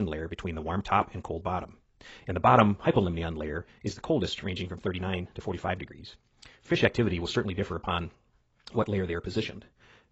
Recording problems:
garbled, watery; badly; nothing above 7.5 kHz
wrong speed, natural pitch; too fast; 1.6 times normal speed
abrupt cut into speech; at the start

